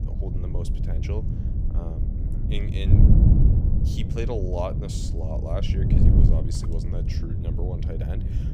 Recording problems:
wind noise on the microphone; heavy; as loud as the speech

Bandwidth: 15.5 kHz